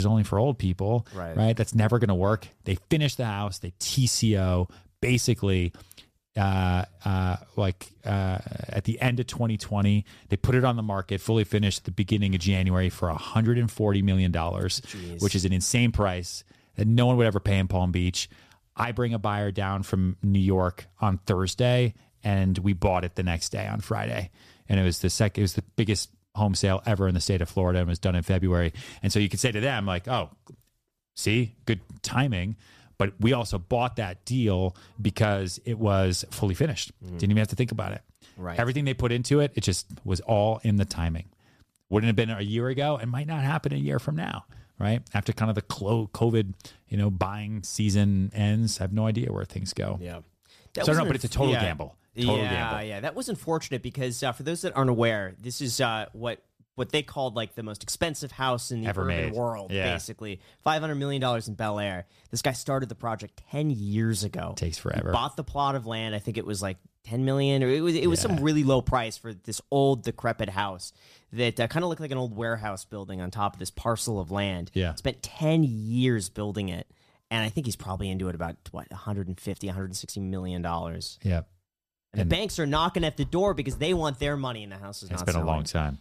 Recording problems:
abrupt cut into speech; at the start

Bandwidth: 14.5 kHz